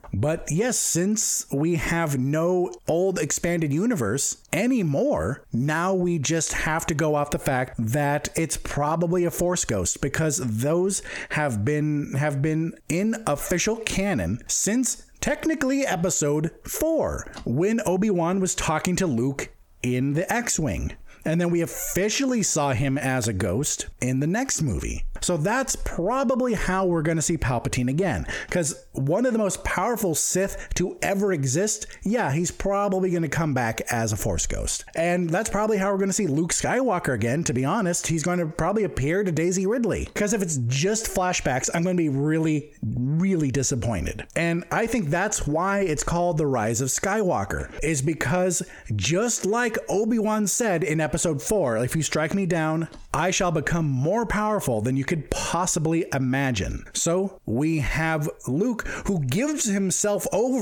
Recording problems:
squashed, flat; heavily
abrupt cut into speech; at the end

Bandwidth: 18 kHz